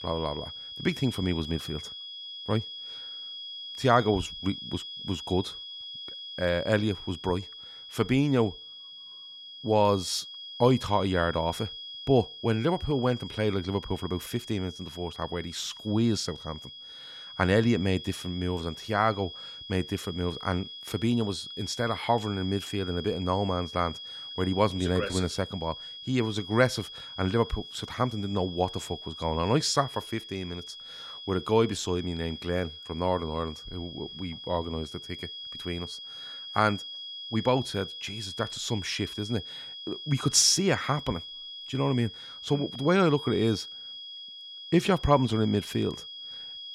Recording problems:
high-pitched whine; noticeable; throughout; 3.5 kHz, 10 dB below the speech

